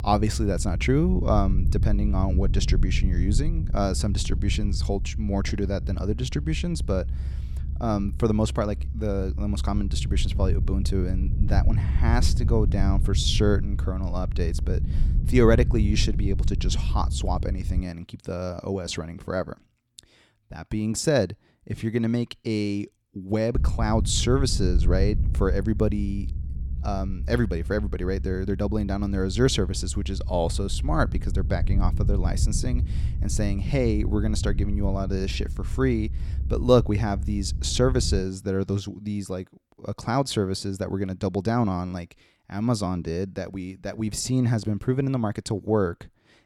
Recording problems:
low rumble; noticeable; until 18 s and from 24 to 38 s; 15 dB below the speech

